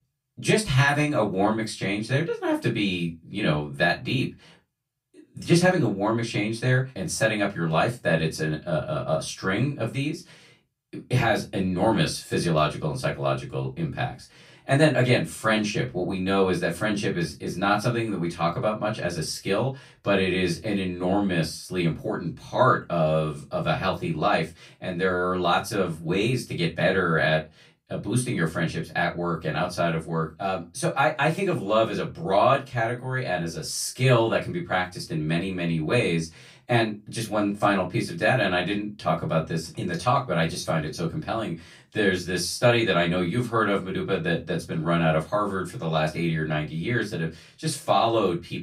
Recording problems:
off-mic speech; far
room echo; very slight; dies away in 0.2 s

